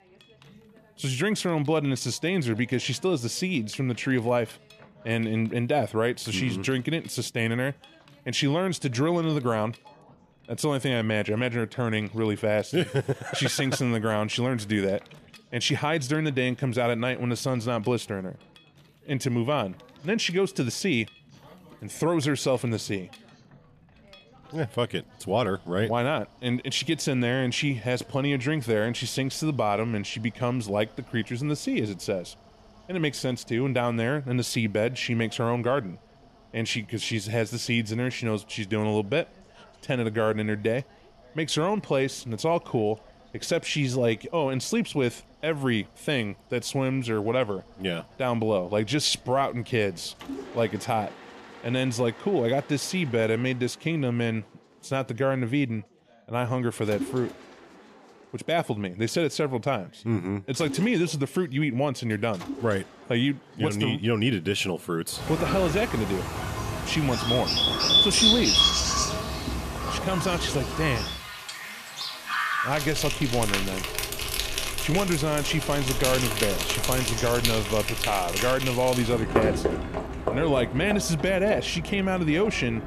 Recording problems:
animal sounds; very loud; from 1:05 on; 1 dB above the speech
machinery noise; faint; throughout; 25 dB below the speech
background chatter; faint; throughout; 2 voices, 30 dB below the speech

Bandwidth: 14.5 kHz